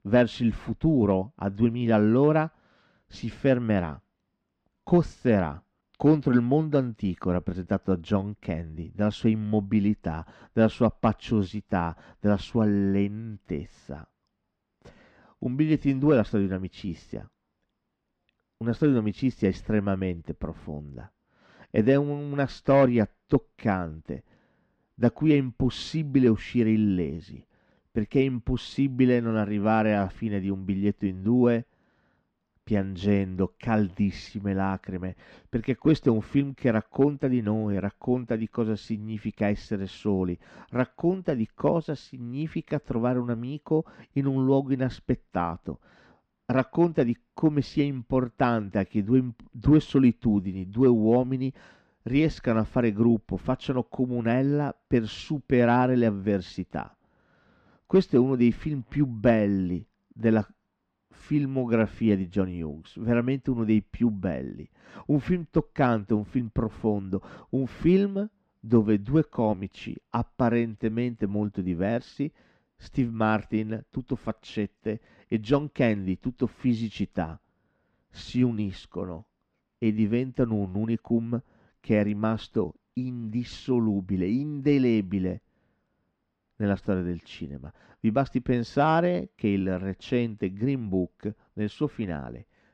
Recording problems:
muffled; very slightly; fading above 3 kHz

